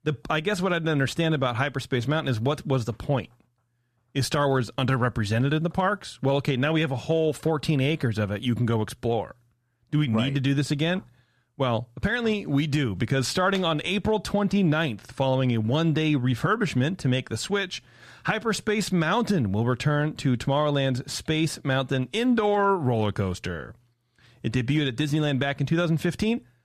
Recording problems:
none

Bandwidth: 14 kHz